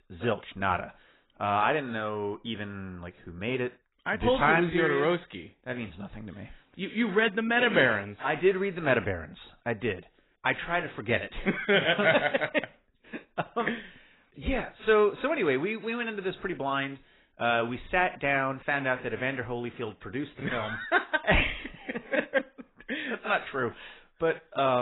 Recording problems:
garbled, watery; badly; nothing above 4 kHz
abrupt cut into speech; at the end

